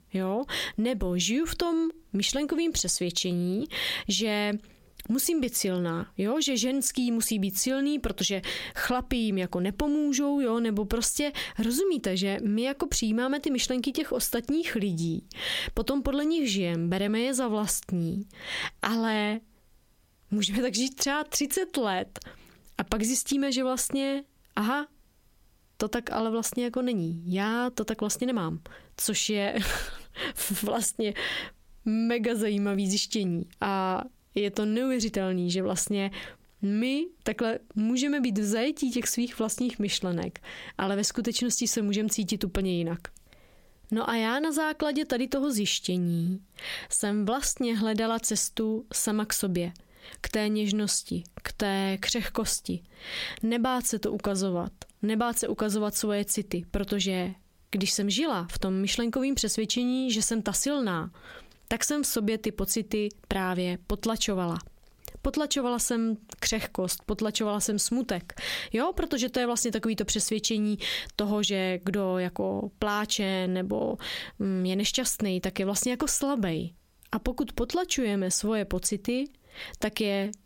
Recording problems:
squashed, flat; heavily

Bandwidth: 16.5 kHz